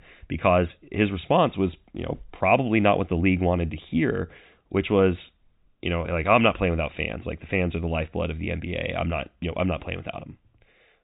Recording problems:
high frequencies cut off; severe; nothing above 4 kHz

